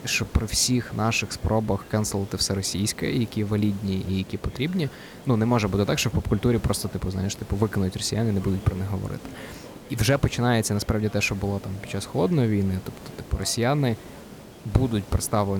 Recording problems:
hiss; noticeable; throughout; 20 dB below the speech
background chatter; faint; throughout; 4 voices, 25 dB below the speech
abrupt cut into speech; at the end

